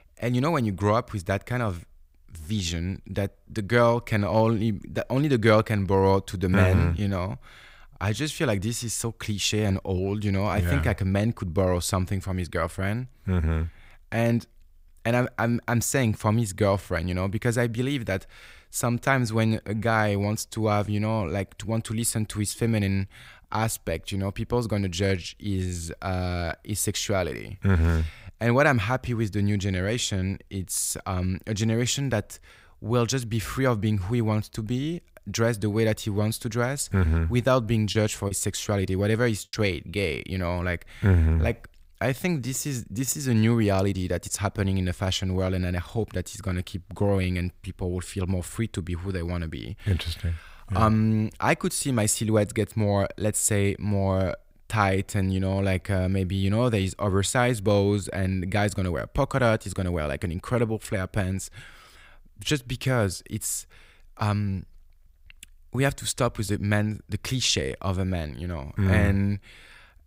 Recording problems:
choppy; occasionally; from 38 to 40 s; 3% of the speech affected

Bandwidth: 15.5 kHz